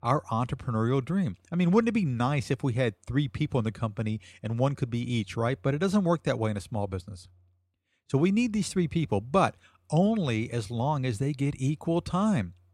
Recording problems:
none

